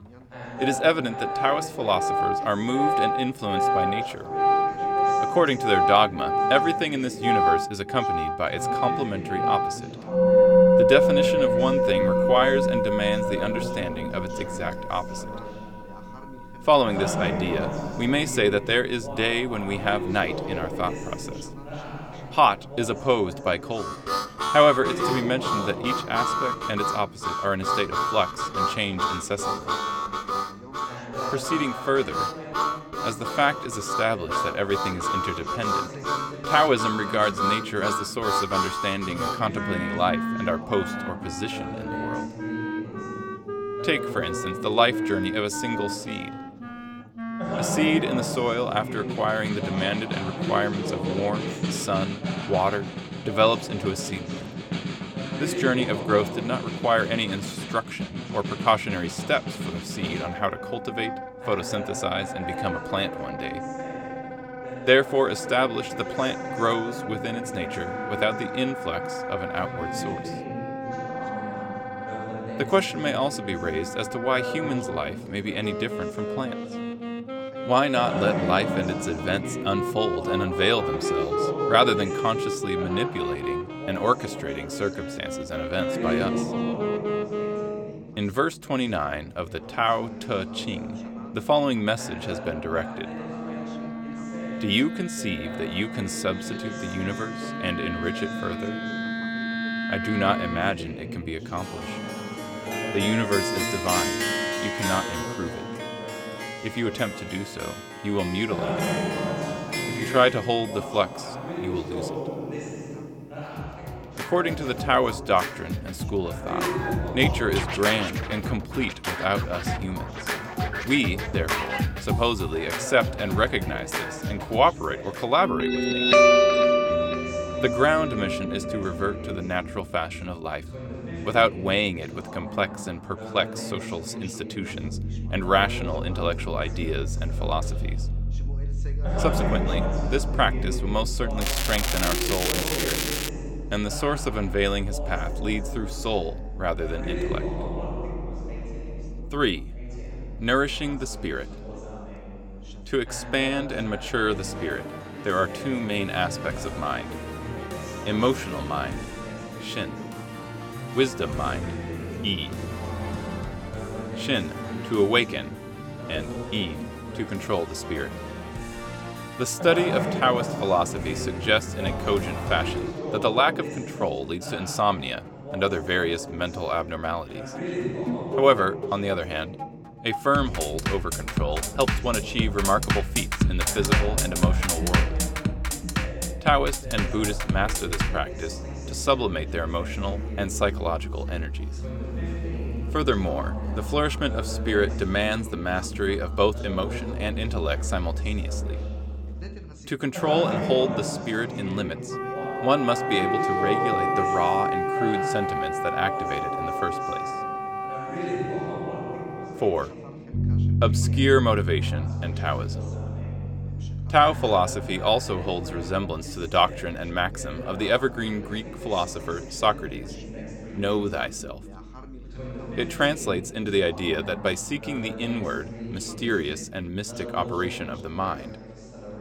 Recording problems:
background music; loud; throughout; 3 dB below the speech
background chatter; loud; throughout; 2 voices, 10 dB below the speech
crackling; loud; from 2:21 to 2:23; as loud as the speech

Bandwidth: 17 kHz